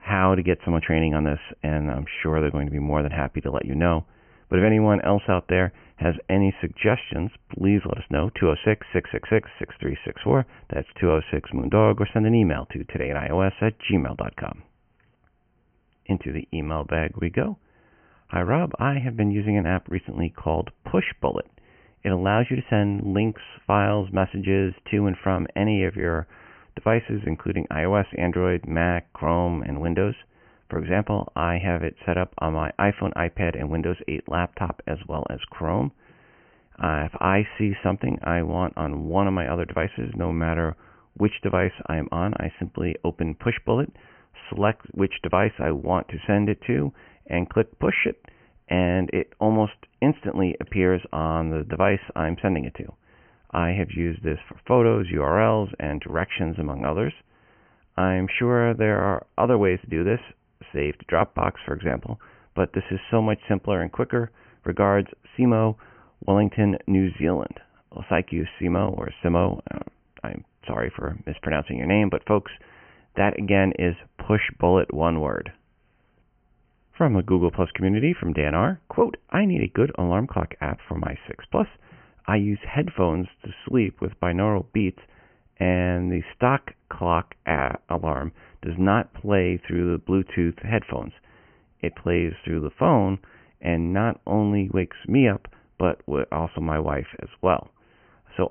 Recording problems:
high frequencies cut off; severe; nothing above 3 kHz

